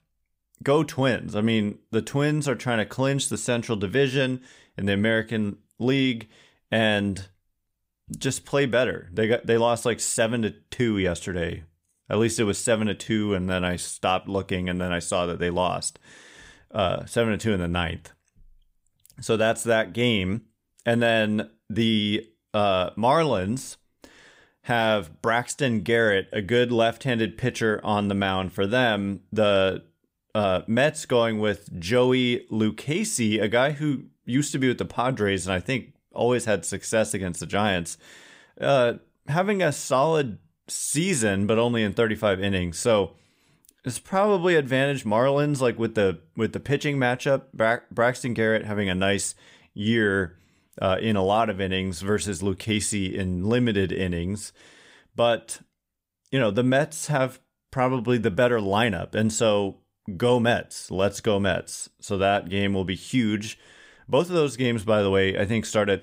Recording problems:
uneven, jittery; slightly; from 13 s to 1:04

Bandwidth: 15.5 kHz